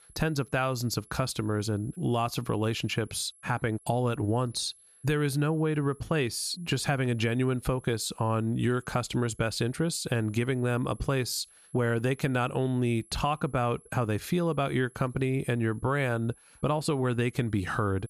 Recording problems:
high-pitched whine; faint; throughout; 11 kHz, 25 dB below the speech

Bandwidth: 14.5 kHz